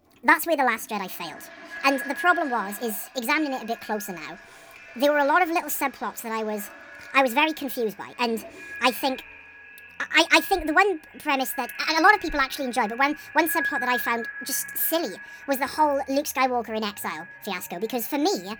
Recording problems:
wrong speed and pitch; too fast and too high; 1.5 times normal speed
echo of what is said; noticeable; throughout; 460 ms later, 15 dB below the speech
household noises; faint; throughout; 25 dB below the speech

